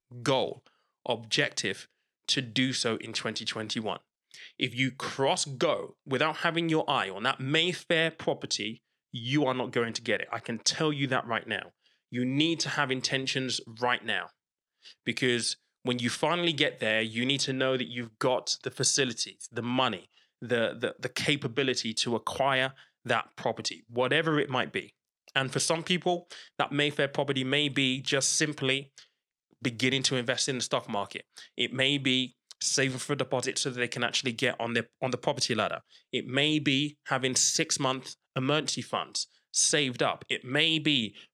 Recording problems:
none

